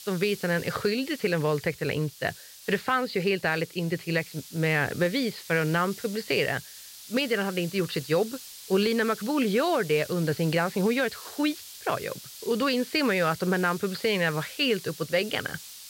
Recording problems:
high frequencies cut off; severe; nothing above 5 kHz
hiss; noticeable; throughout; 15 dB below the speech

